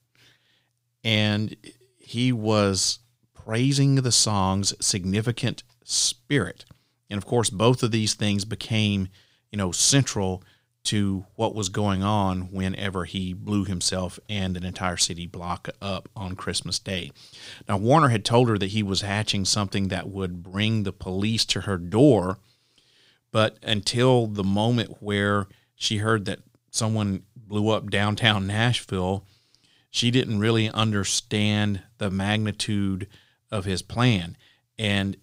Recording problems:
none

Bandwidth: 15.5 kHz